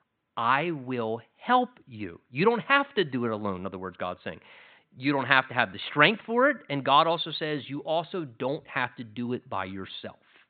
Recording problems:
high frequencies cut off; severe; nothing above 4 kHz

